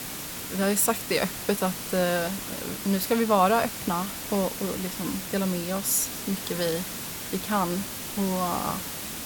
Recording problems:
hiss; loud; throughout; 6 dB below the speech

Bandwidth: 18 kHz